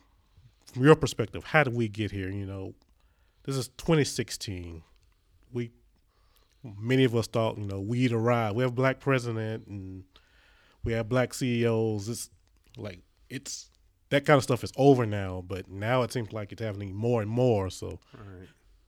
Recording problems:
none

